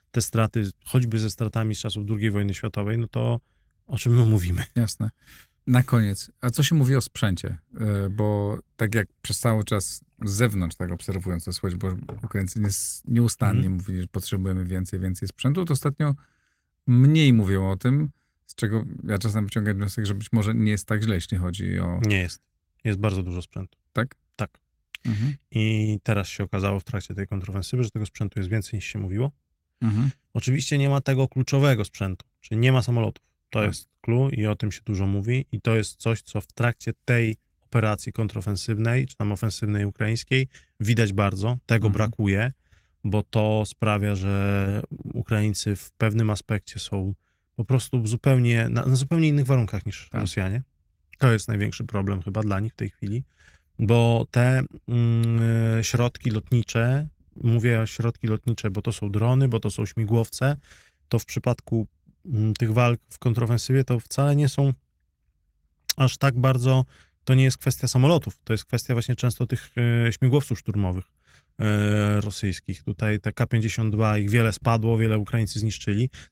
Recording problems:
garbled, watery; slightly; nothing above 16 kHz

